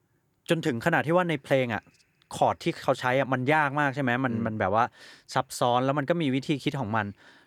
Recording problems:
none

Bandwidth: 18.5 kHz